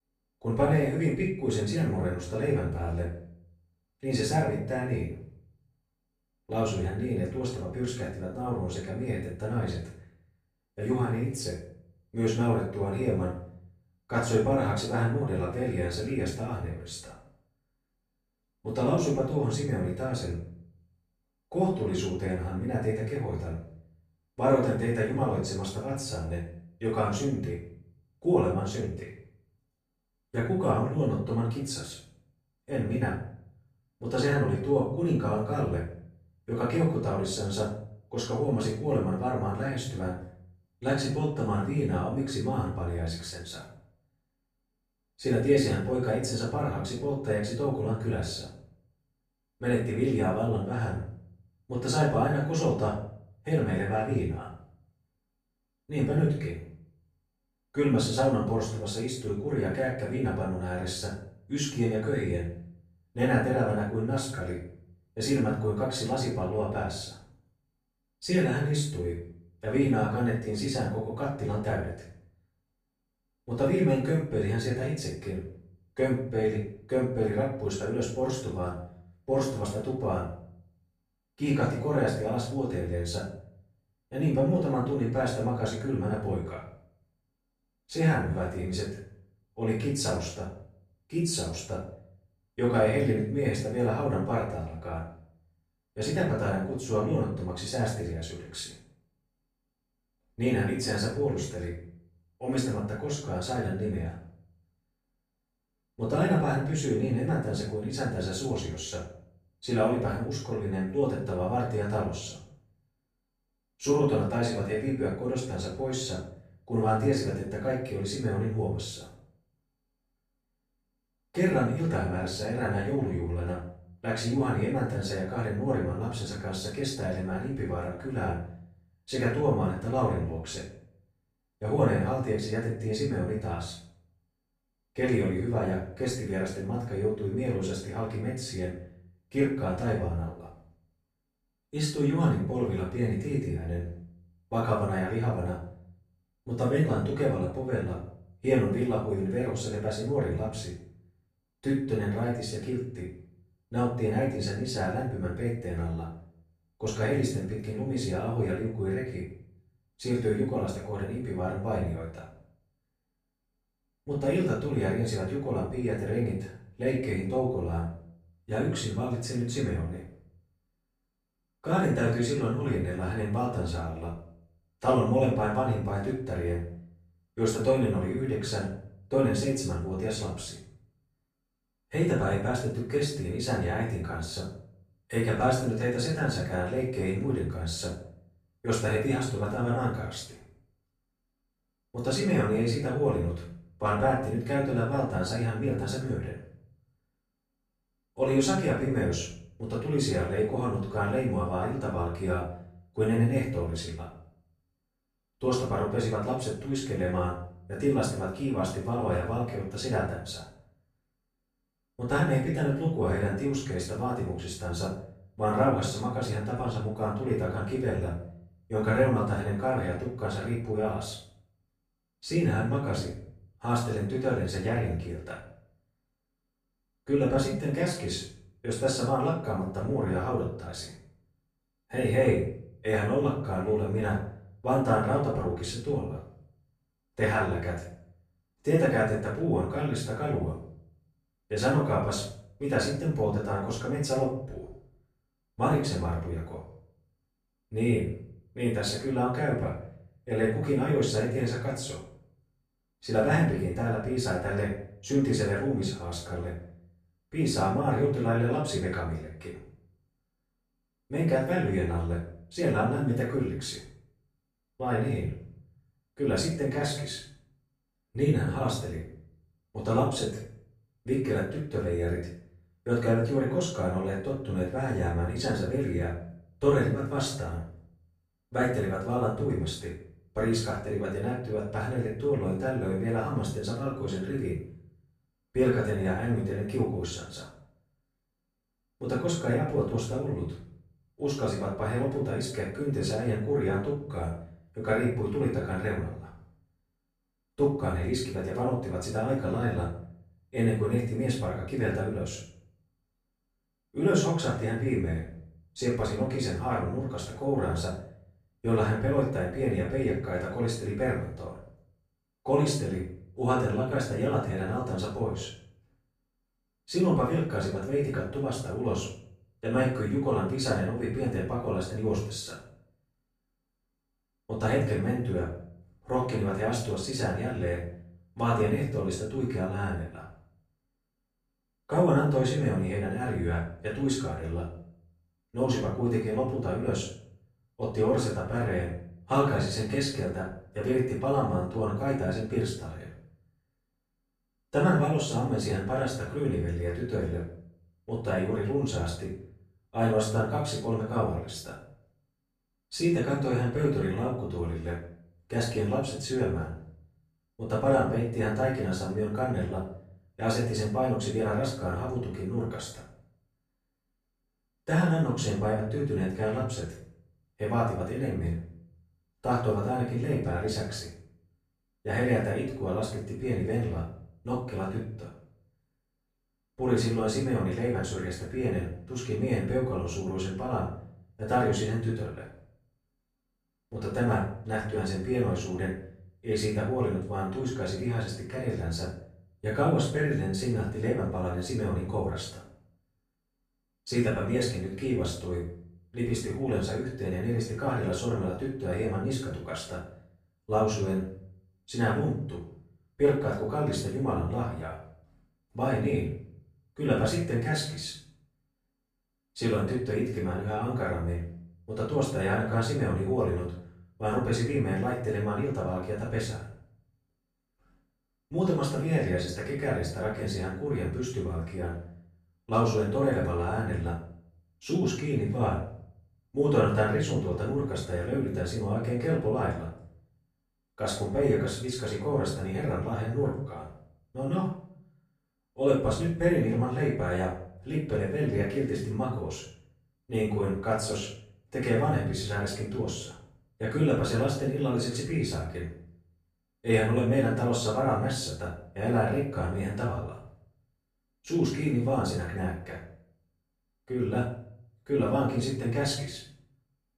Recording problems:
off-mic speech; far
room echo; noticeable; dies away in 0.5 s

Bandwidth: 13.5 kHz